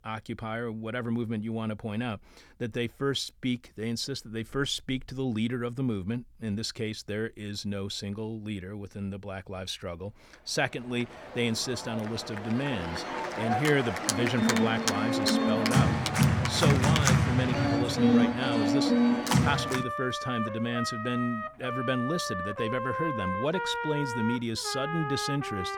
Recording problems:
background music; very loud; from 11 s on; 3 dB above the speech

